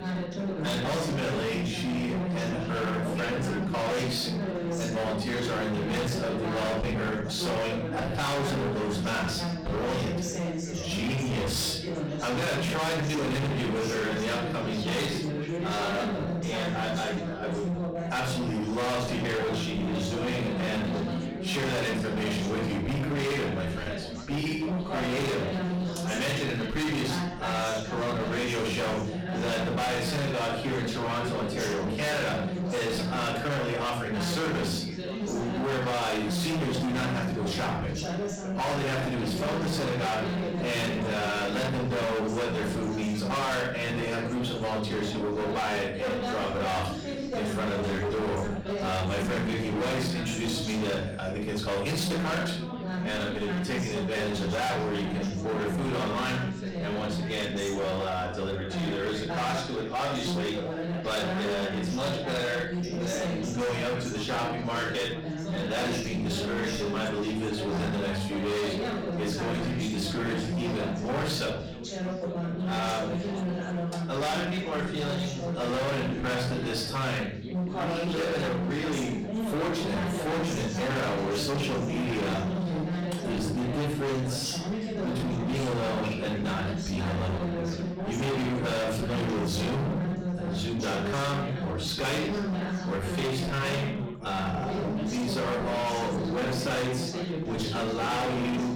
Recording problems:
distortion; heavy; 37% of the sound clipped
off-mic speech; far
room echo; noticeable; dies away in 0.5 s
background chatter; loud; throughout; 4 voices, 3 dB below the speech

